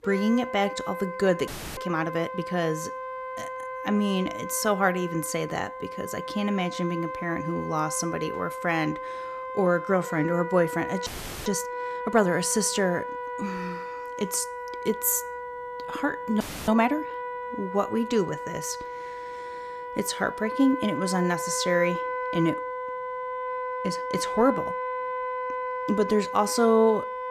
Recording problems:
background music; loud; throughout; 7 dB below the speech
audio freezing; at 1.5 s, at 11 s and at 16 s

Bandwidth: 14.5 kHz